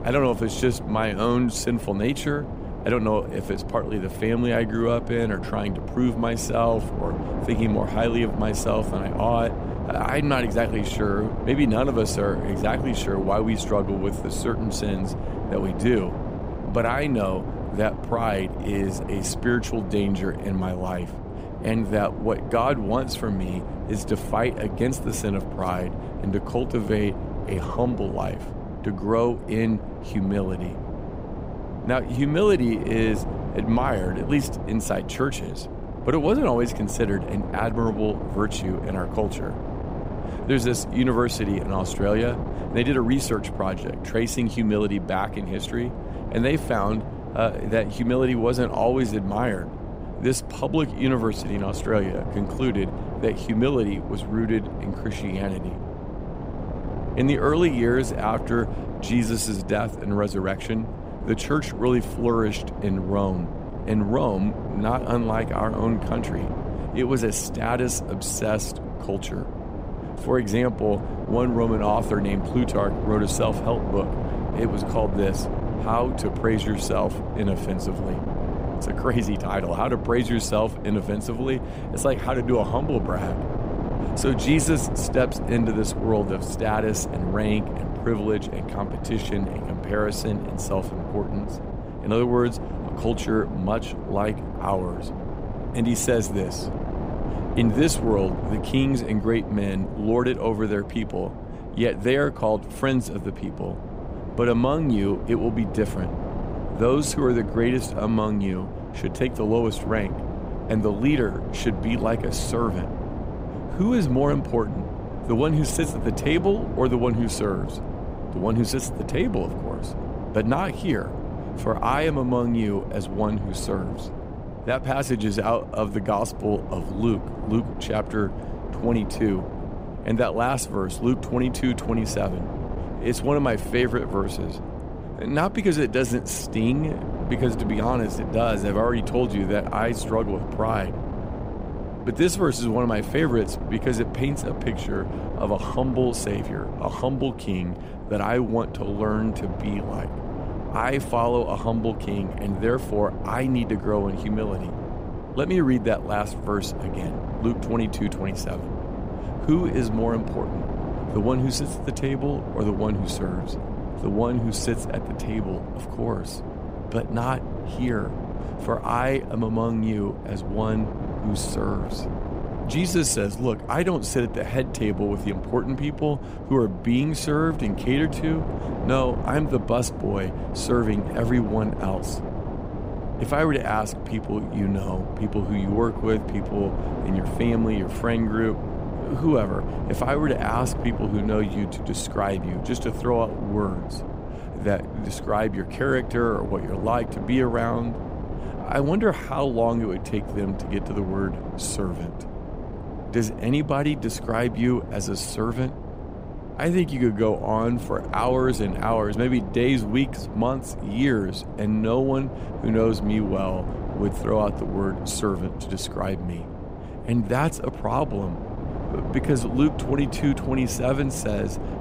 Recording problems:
wind noise on the microphone; heavy; 9 dB below the speech

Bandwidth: 15.5 kHz